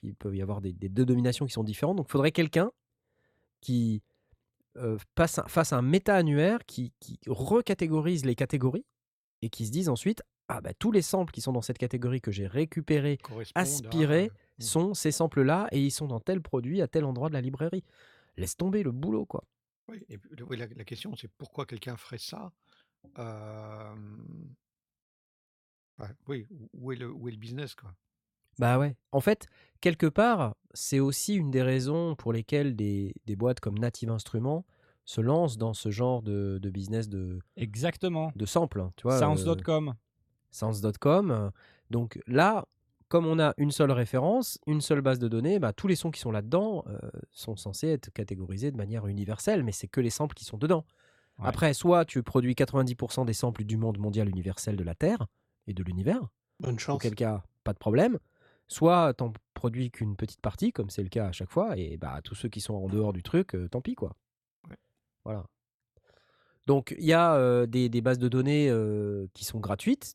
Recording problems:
none

